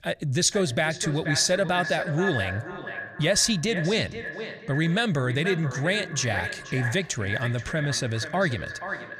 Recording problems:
echo of what is said; strong; throughout; 480 ms later, 8 dB below the speech

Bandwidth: 15 kHz